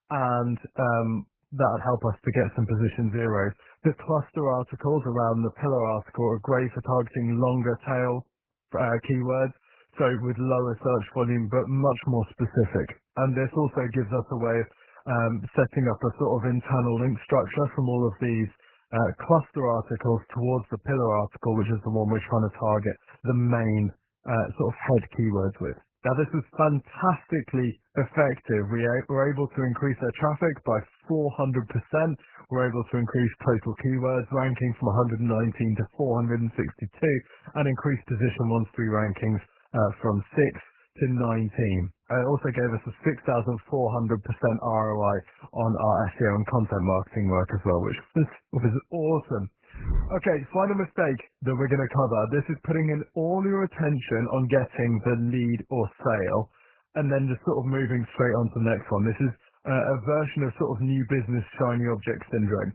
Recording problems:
garbled, watery; badly; nothing above 3 kHz

